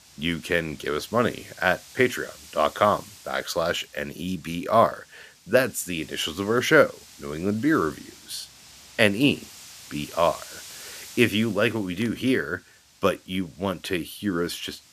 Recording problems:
wind noise on the microphone; occasional gusts; 20 dB below the speech

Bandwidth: 14.5 kHz